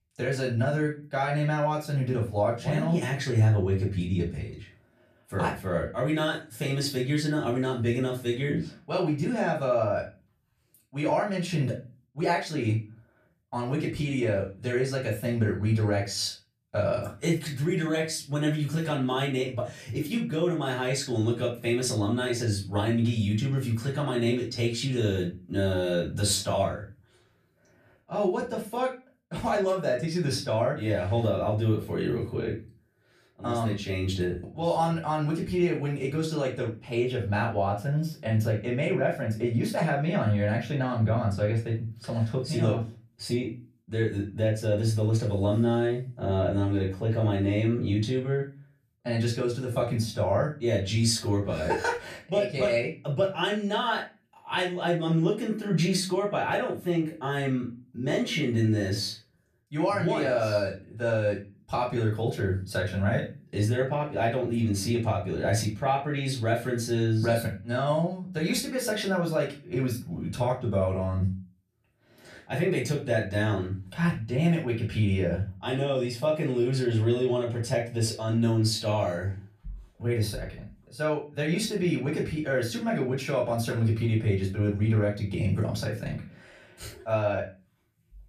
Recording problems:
off-mic speech; far
room echo; slight; dies away in 0.3 s

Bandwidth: 14.5 kHz